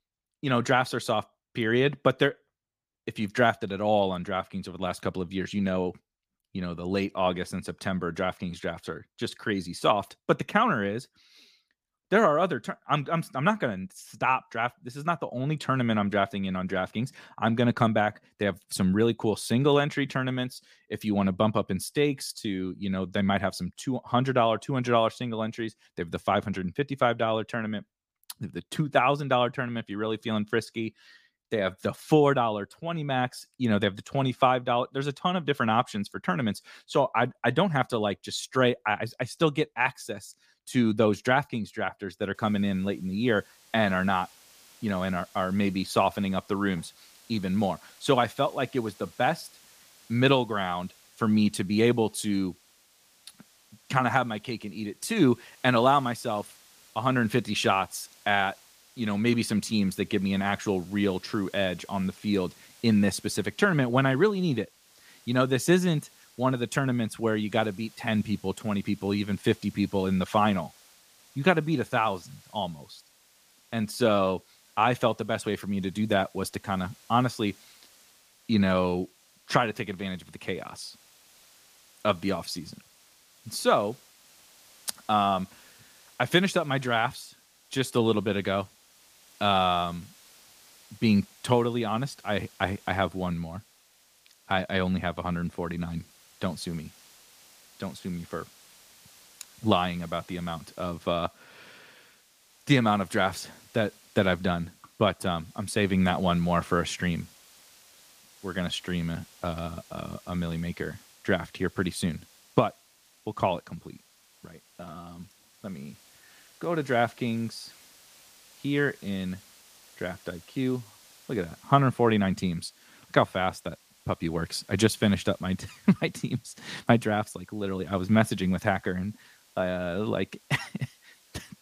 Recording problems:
hiss; faint; from 42 s on; 25 dB below the speech

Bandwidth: 15 kHz